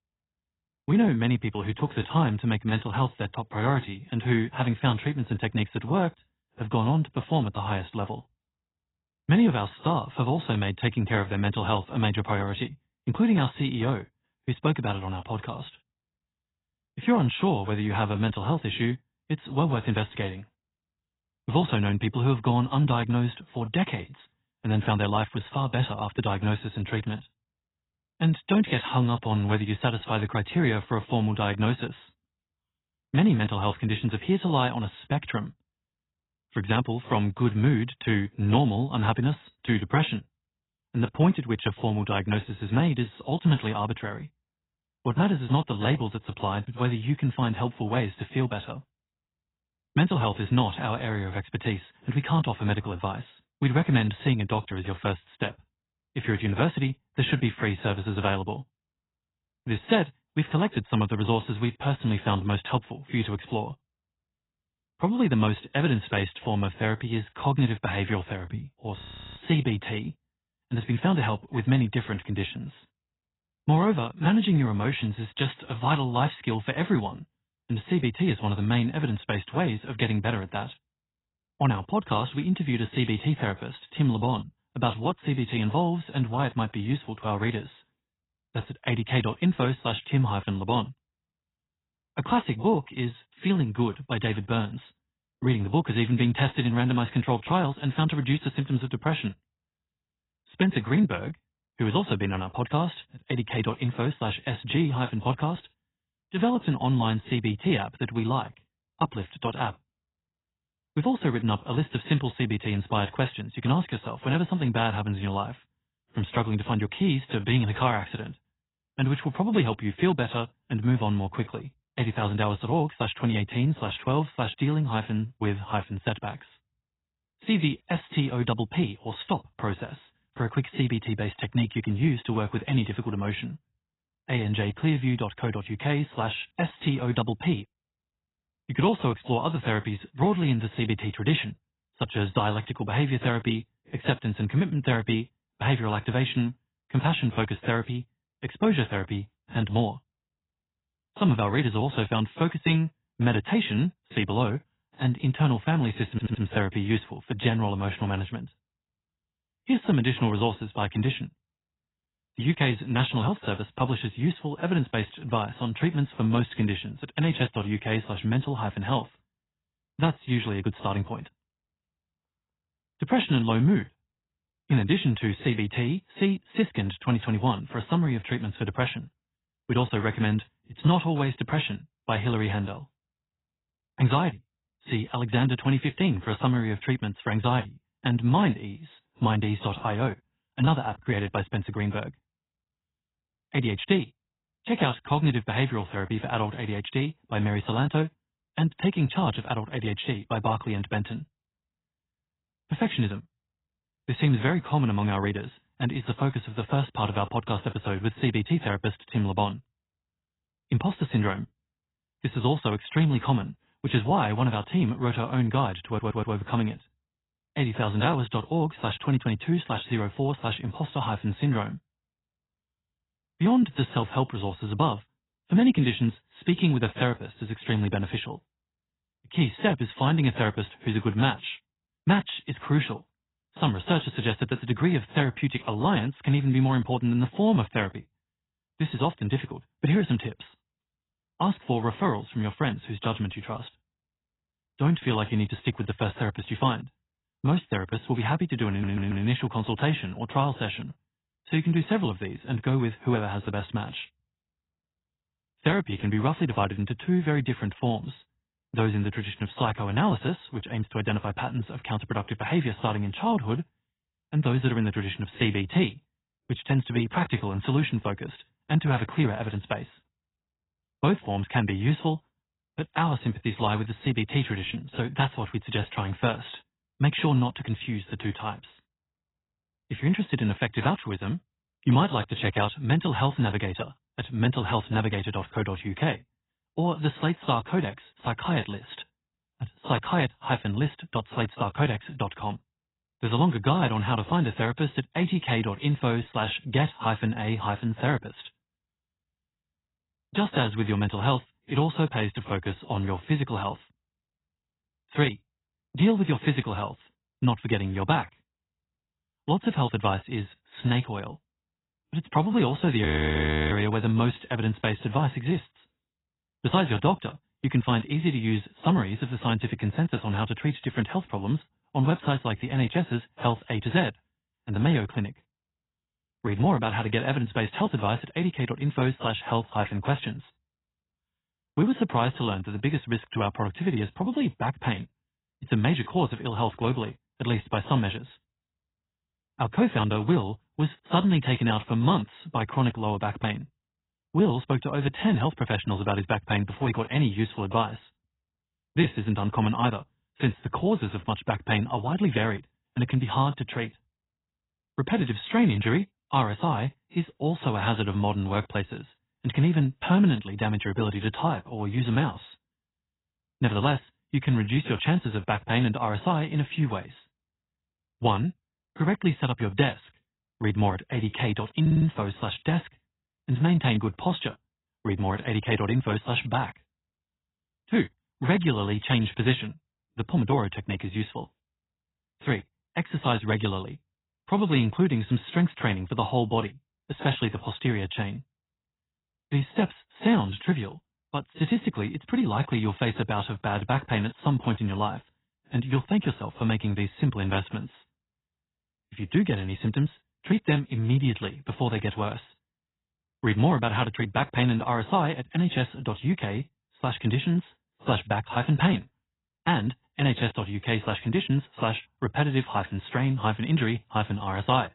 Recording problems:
garbled, watery; badly; nothing above 4 kHz
audio freezing; at 1:09 and at 5:13 for 0.5 s
audio stuttering; 4 times, first at 2:36

